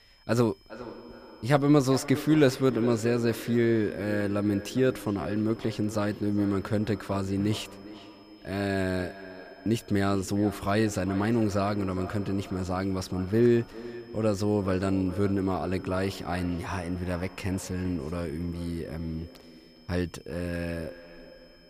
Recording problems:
echo of what is said; noticeable; throughout; 410 ms later, 15 dB below the speech
high-pitched whine; faint; throughout; 5 kHz, 30 dB below the speech

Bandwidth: 15 kHz